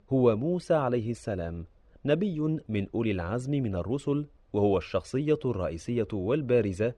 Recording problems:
muffled; slightly; fading above 4 kHz

